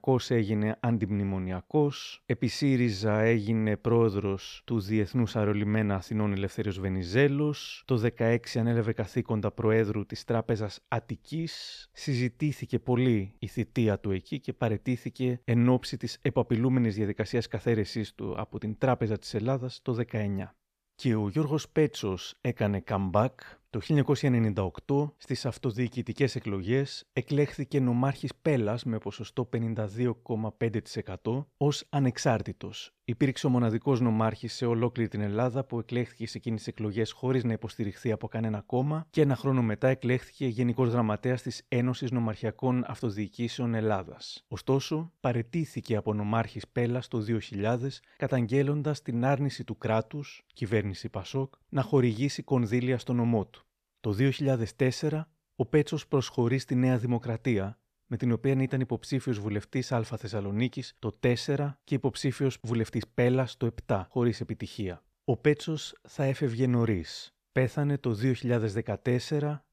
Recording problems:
none

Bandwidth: 14.5 kHz